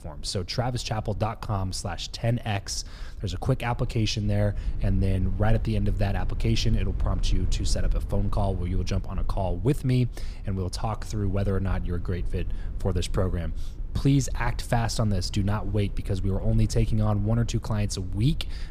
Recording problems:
low rumble; noticeable; throughout; 20 dB below the speech

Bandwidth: 15 kHz